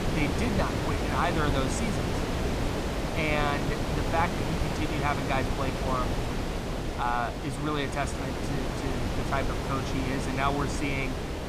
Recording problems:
wind noise on the microphone; heavy; 2 dB below the speech

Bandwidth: 15 kHz